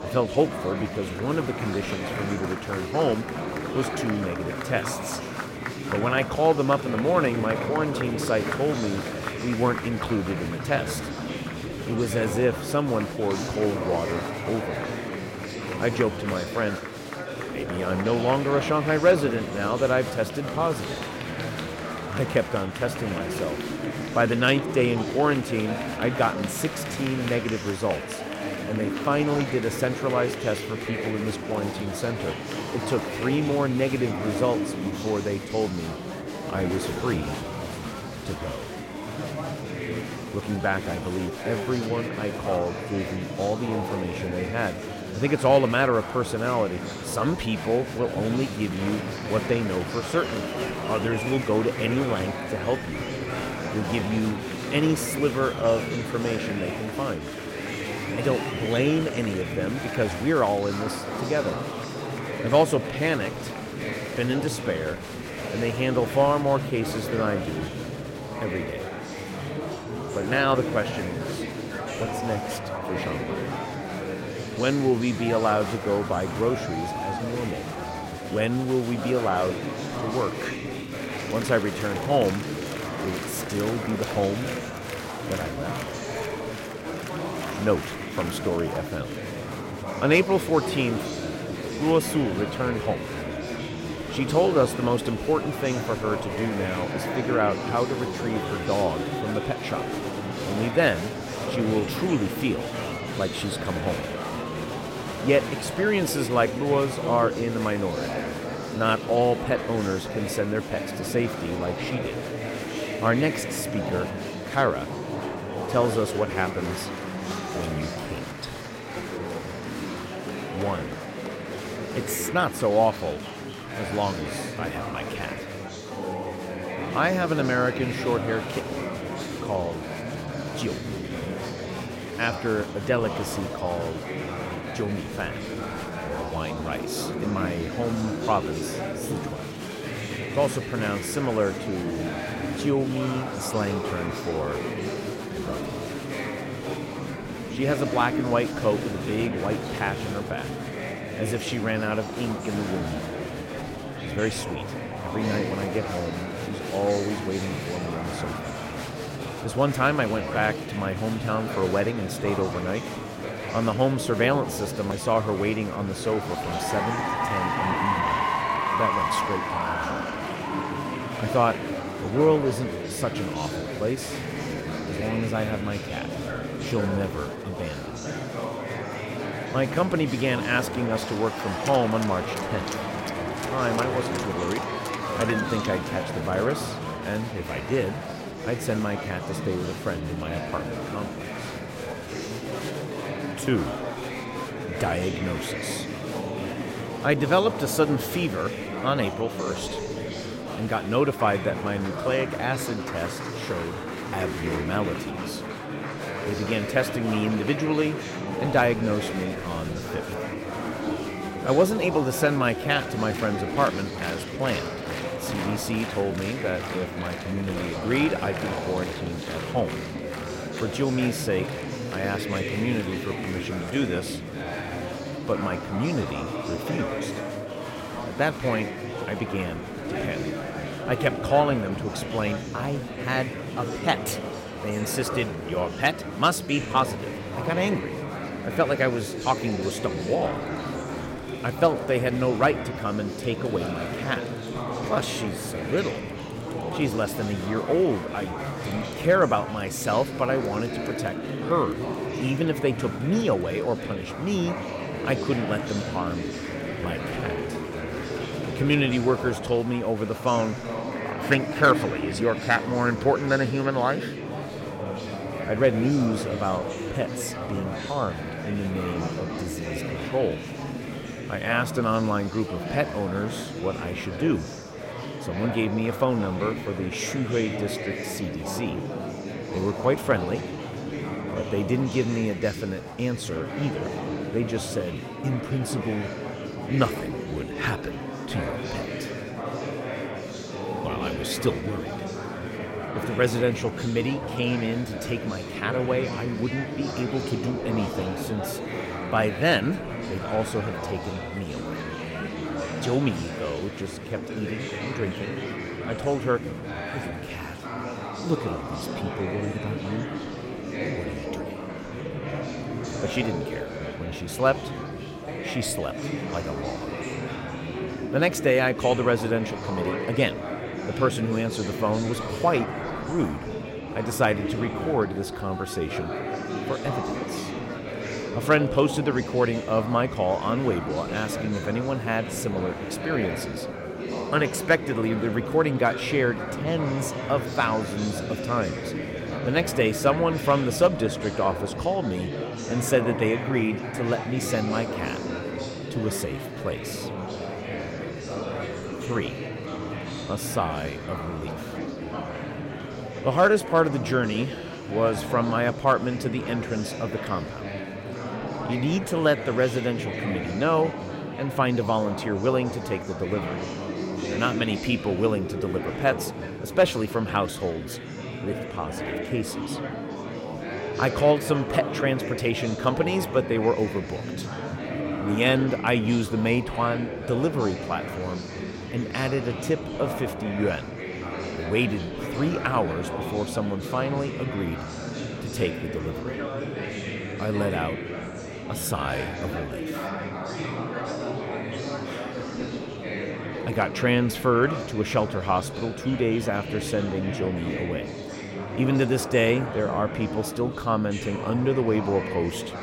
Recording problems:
murmuring crowd; loud; throughout; 5 dB below the speech

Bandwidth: 16 kHz